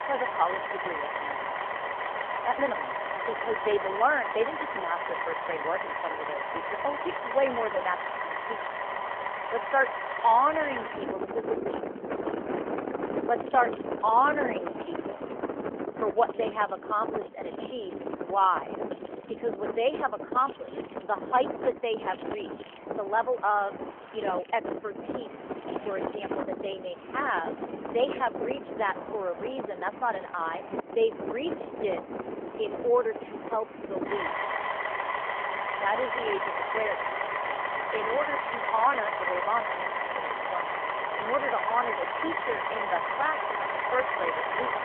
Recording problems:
phone-call audio; nothing above 3.5 kHz
traffic noise; loud; throughout; 3 dB below the speech
machinery noise; faint; throughout; 25 dB below the speech

